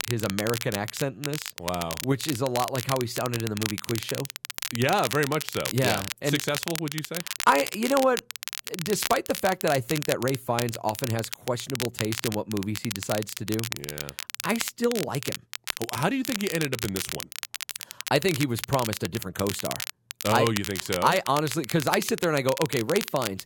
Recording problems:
crackle, like an old record; loud; 6 dB below the speech

